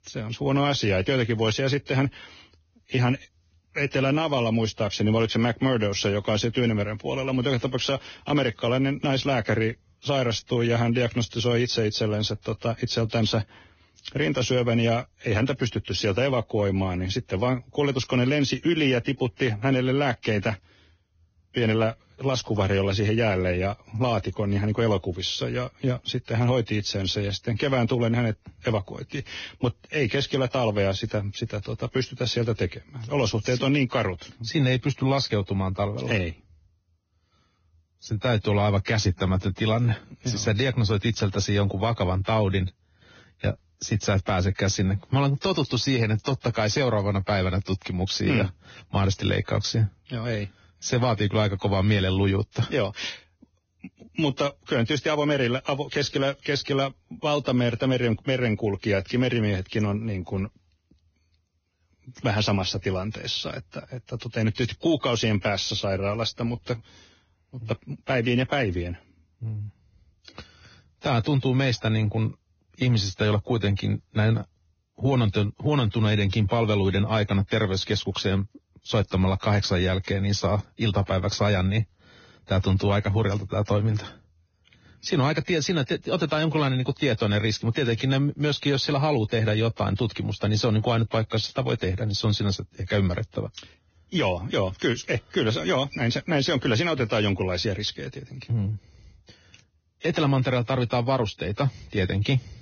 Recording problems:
garbled, watery; badly; nothing above 6.5 kHz

